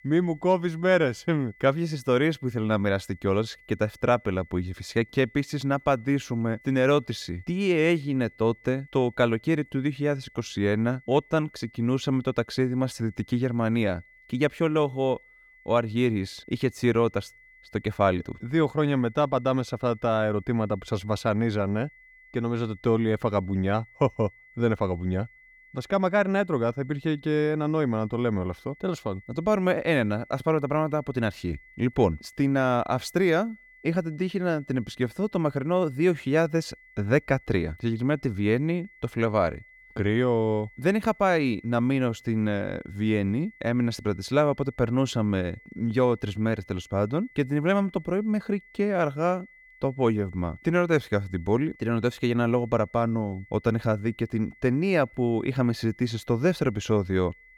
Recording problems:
high-pitched whine; faint; throughout; 2 kHz, 25 dB below the speech

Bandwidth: 17.5 kHz